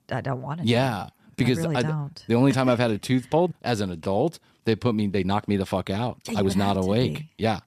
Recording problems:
uneven, jittery; strongly; from 1 to 7 s

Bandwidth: 14.5 kHz